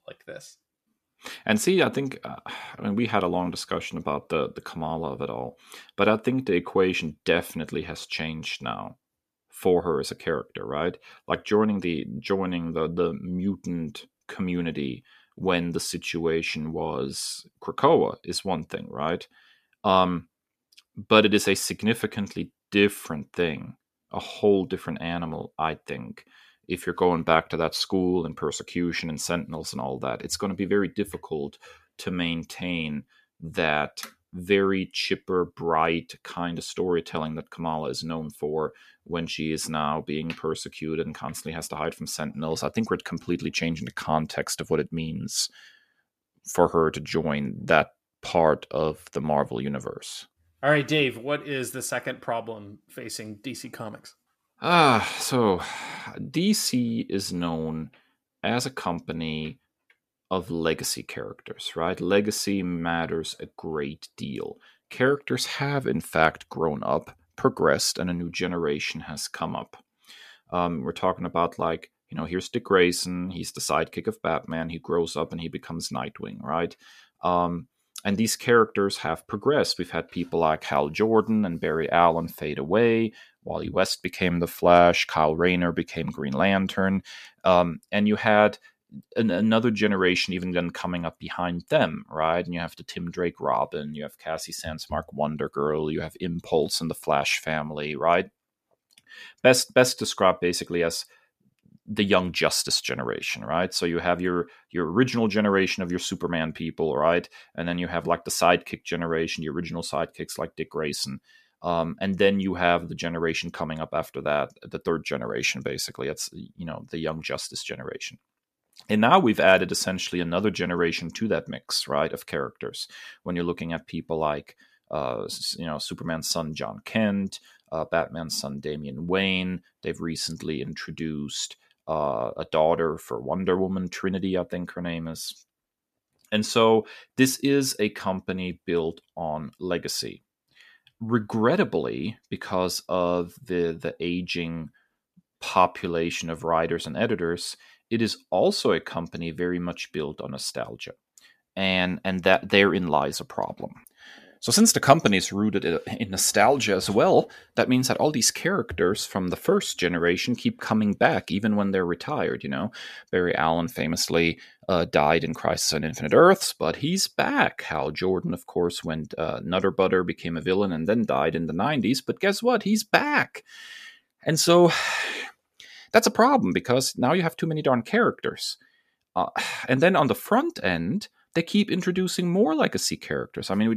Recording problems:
abrupt cut into speech; at the end

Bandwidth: 14.5 kHz